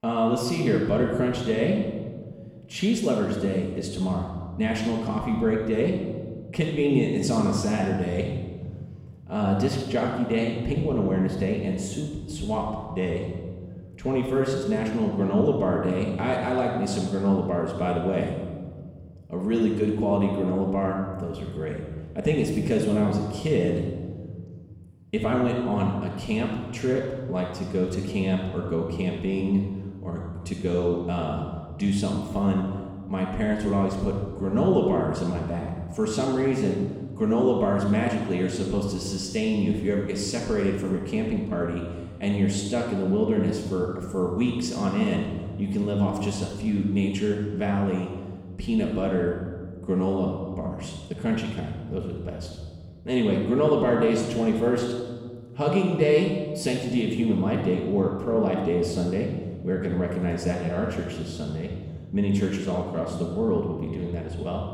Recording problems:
off-mic speech; far
room echo; noticeable; dies away in 1.7 s

